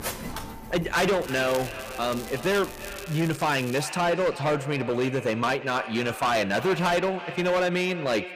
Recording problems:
distortion; heavy; 13% of the sound clipped
echo of what is said; noticeable; throughout; 330 ms later, 15 dB below the speech
machinery noise; noticeable; until 3 s; 15 dB below the speech
crackling; noticeable; from 1 to 4 s; 15 dB below the speech

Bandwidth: 15 kHz